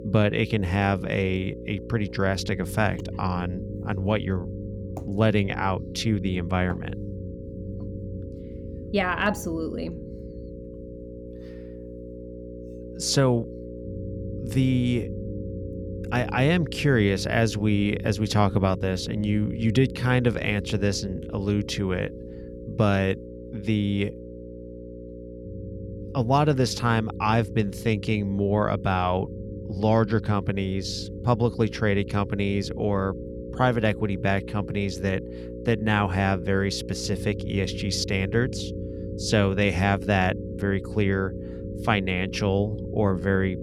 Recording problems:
electrical hum; noticeable; throughout; 60 Hz, 15 dB below the speech
low rumble; faint; throughout; 20 dB below the speech

